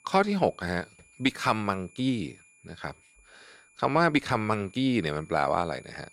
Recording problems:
high-pitched whine; faint; throughout; 2.5 kHz, 30 dB below the speech

